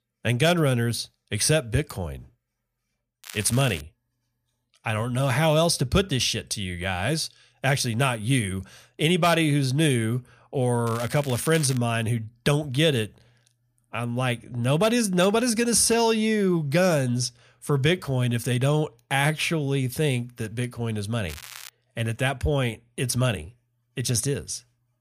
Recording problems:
crackling; noticeable; at 3 s, at 11 s and at 21 s; 15 dB below the speech

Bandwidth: 15 kHz